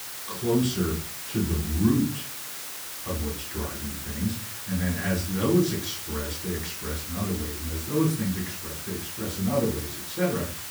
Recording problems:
off-mic speech; far
room echo; slight; dies away in 0.3 s
hiss; loud; throughout; 5 dB below the speech

